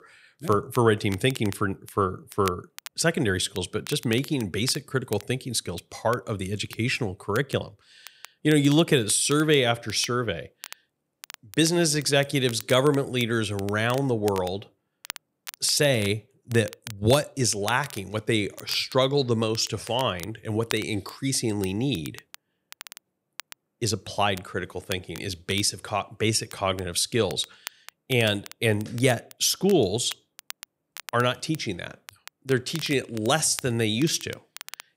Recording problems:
crackle, like an old record; noticeable; 20 dB below the speech

